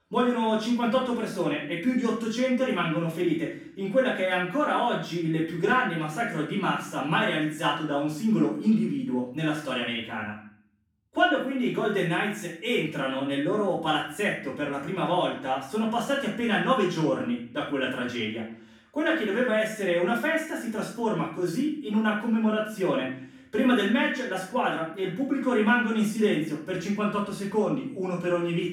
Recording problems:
off-mic speech; far
room echo; noticeable; dies away in 0.5 s

